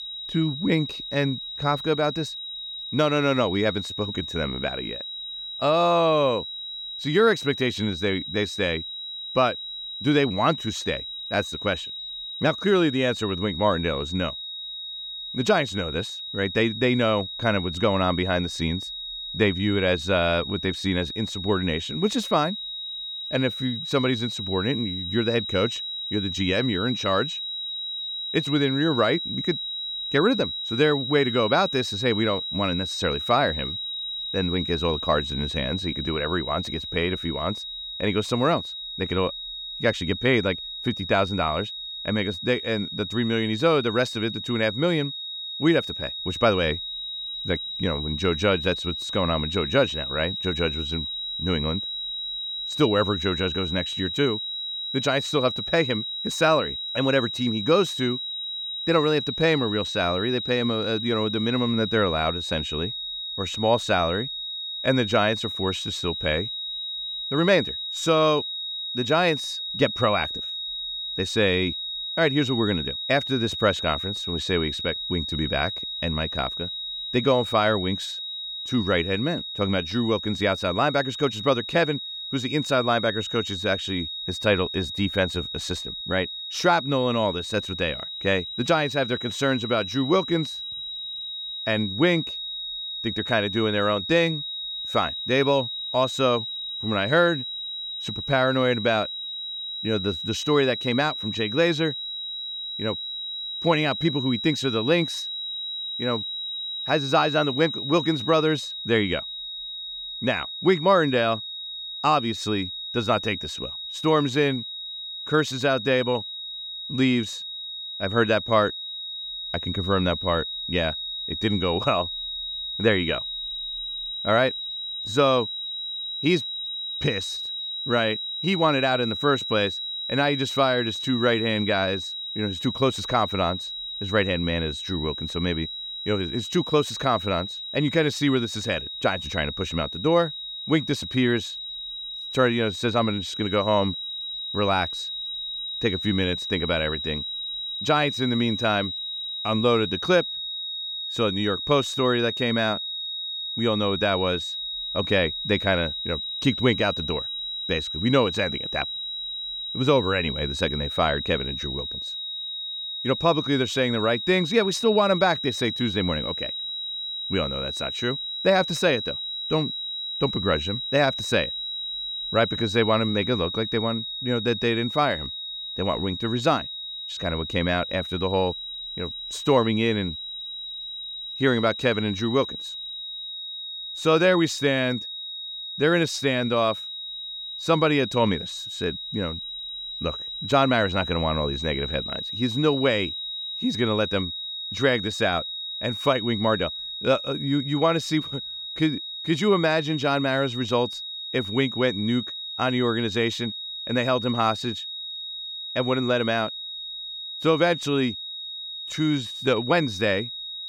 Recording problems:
high-pitched whine; loud; throughout; 4 kHz, 5 dB below the speech

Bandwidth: 17.5 kHz